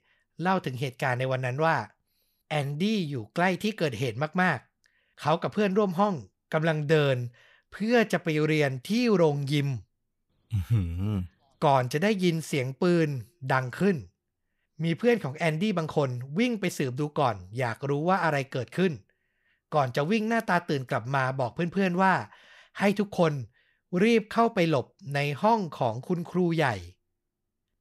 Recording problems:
none

